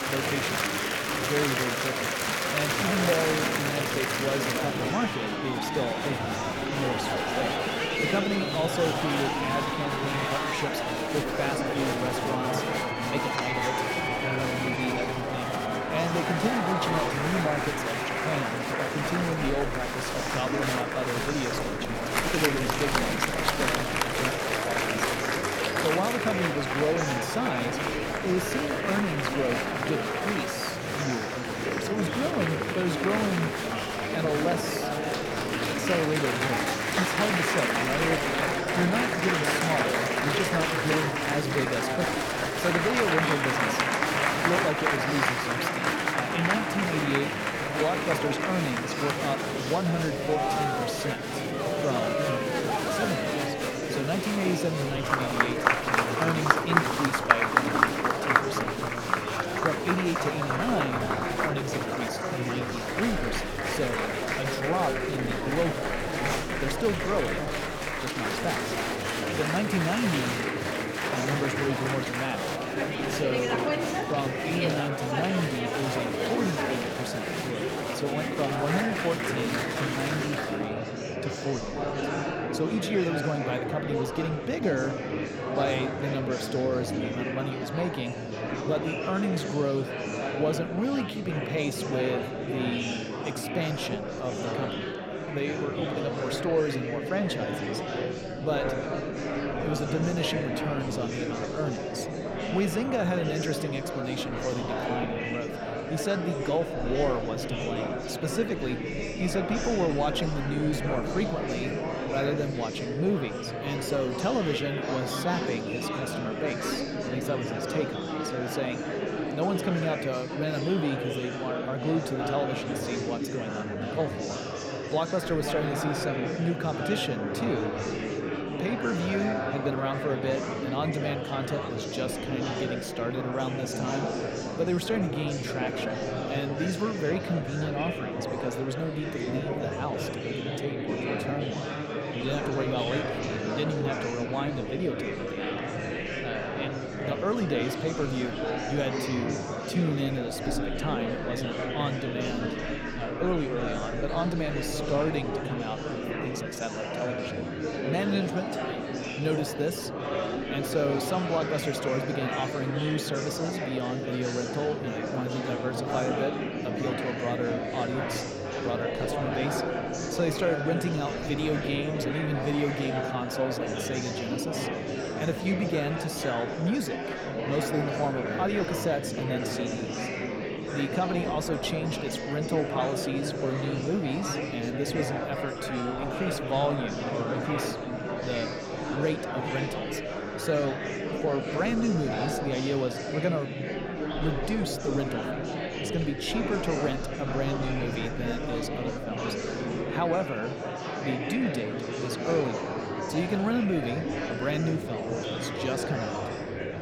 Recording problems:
murmuring crowd; very loud; throughout; 2 dB above the speech

